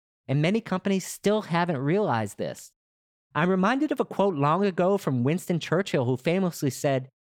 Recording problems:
none

